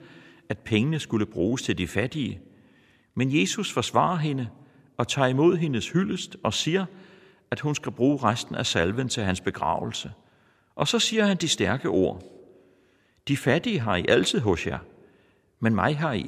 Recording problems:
abrupt cut into speech; at the end

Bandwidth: 14.5 kHz